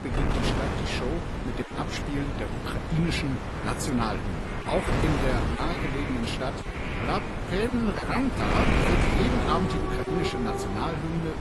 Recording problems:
garbled, watery; slightly; nothing above 11.5 kHz
wind noise on the microphone; heavy; 1 dB below the speech
animal sounds; loud; from 3.5 s on; 5 dB below the speech

